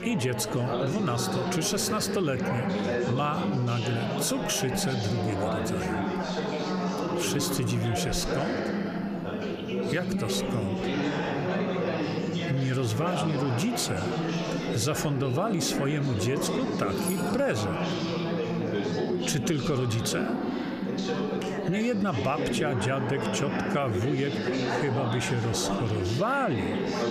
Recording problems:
squashed, flat; somewhat
chatter from many people; loud; throughout; 1 dB below the speech
jangling keys; noticeable; at 17 s; peak 8 dB below the speech

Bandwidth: 15 kHz